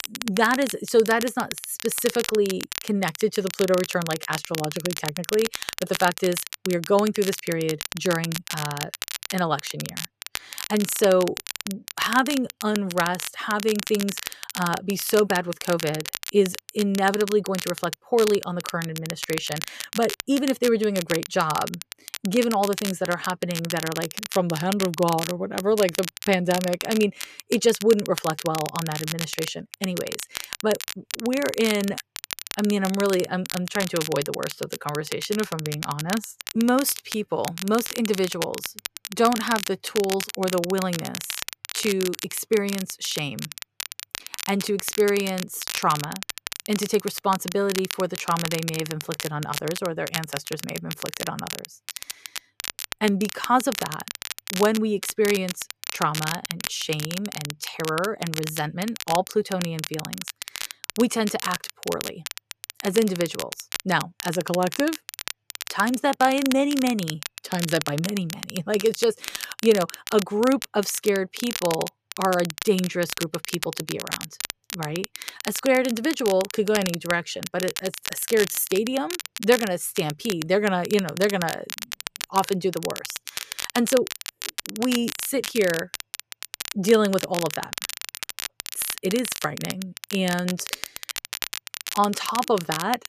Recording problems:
crackle, like an old record; loud; 7 dB below the speech

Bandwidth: 14.5 kHz